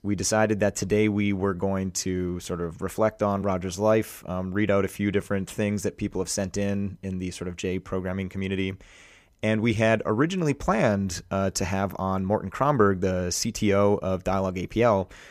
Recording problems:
none

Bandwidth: 15 kHz